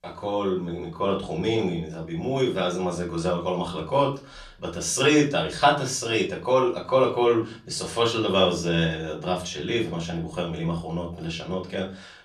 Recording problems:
off-mic speech; far
room echo; slight; dies away in 0.3 s

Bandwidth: 14.5 kHz